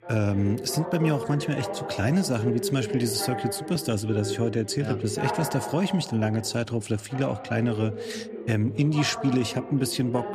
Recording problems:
background chatter; loud; throughout; 2 voices, 8 dB below the speech

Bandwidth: 14.5 kHz